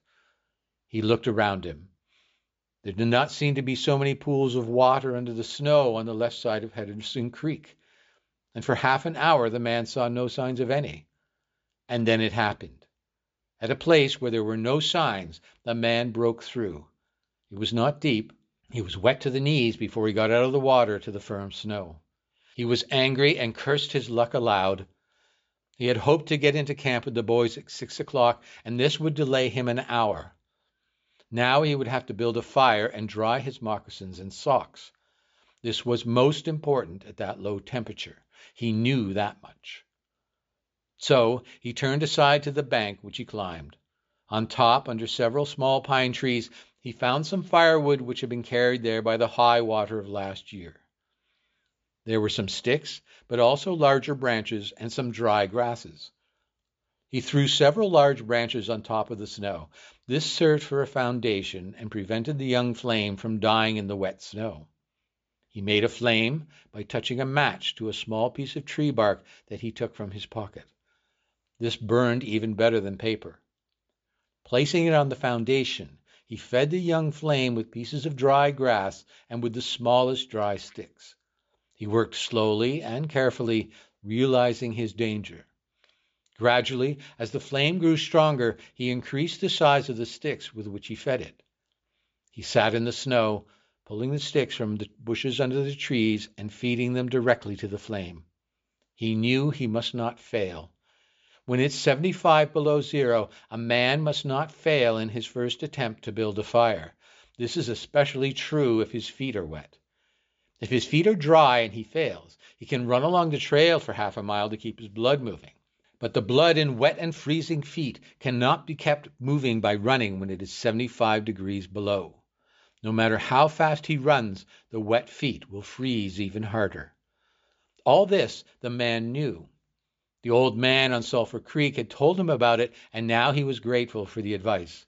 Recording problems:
high frequencies cut off; noticeable; nothing above 7.5 kHz

